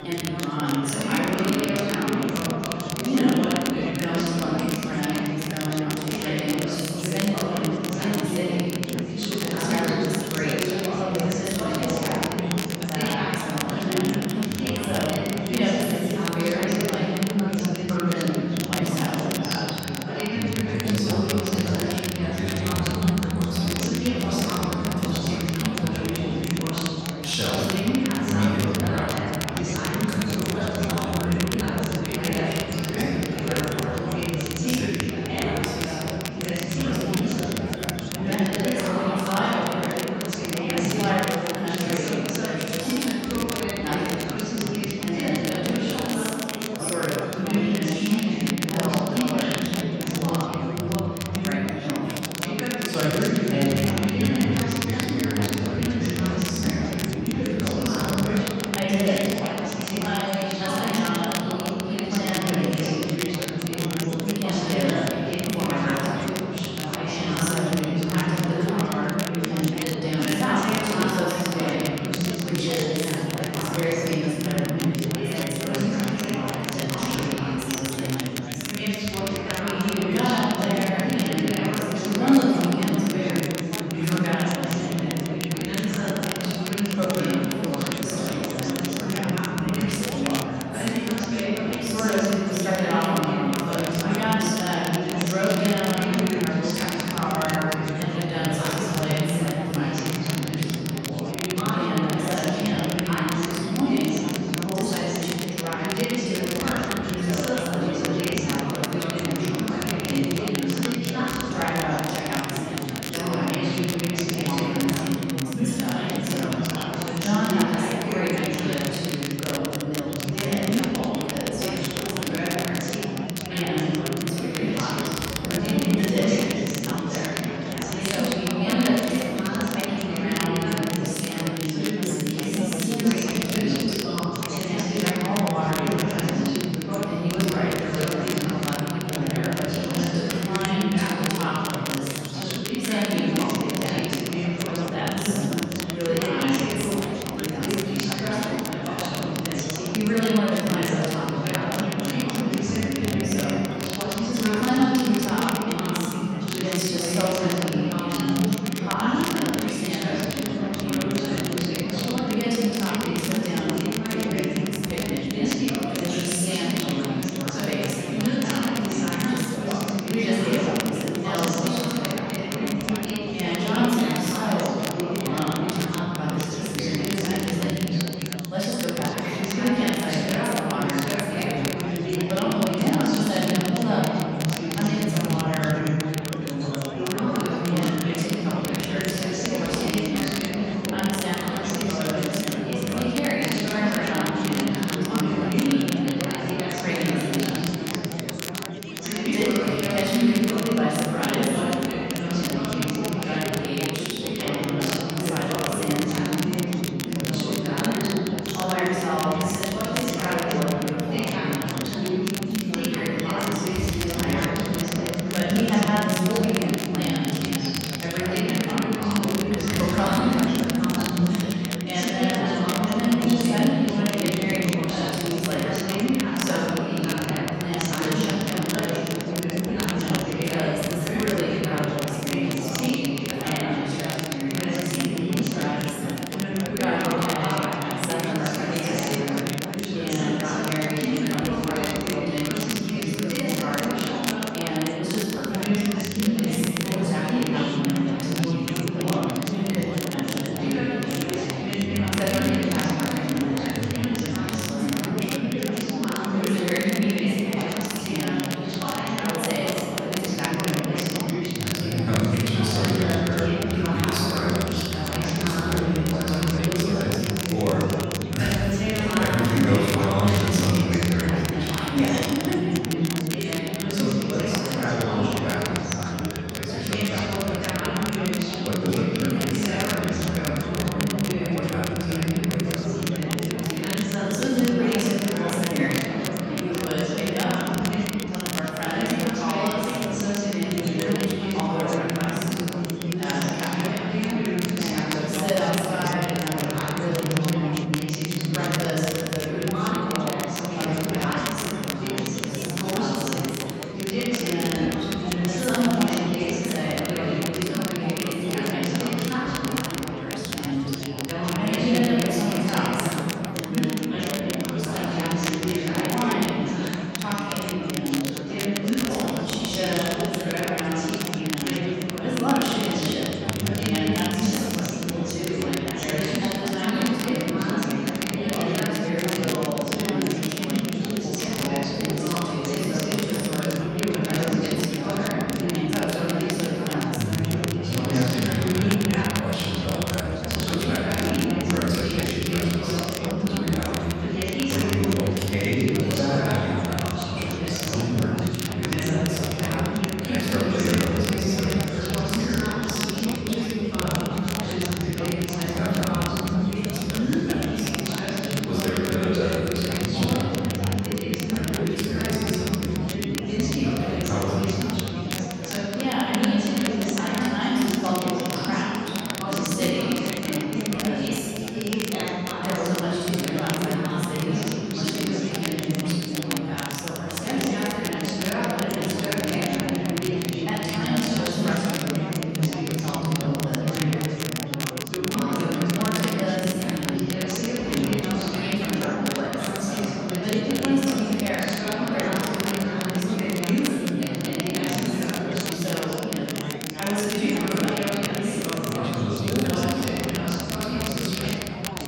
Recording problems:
room echo; strong; dies away in 2.2 s
off-mic speech; far
chatter from many people; very loud; throughout; 1 dB above the speech
crackle, like an old record; loud; 6 dB below the speech

